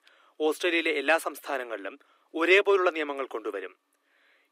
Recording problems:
thin; somewhat; fading below 300 Hz

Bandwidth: 15.5 kHz